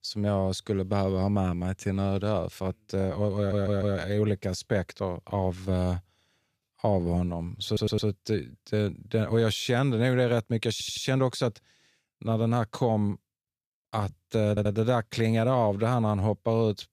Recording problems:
audio stuttering; 4 times, first at 3.5 s

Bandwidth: 14.5 kHz